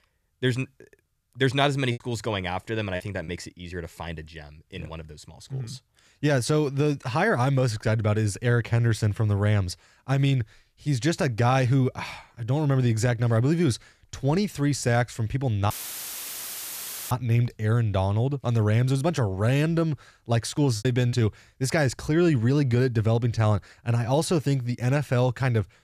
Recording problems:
choppy; very; from 2 to 3.5 s and at 21 s; 5% of the speech affected
audio cutting out; filled with static; at 16 s for 1.5 s

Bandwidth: 14.5 kHz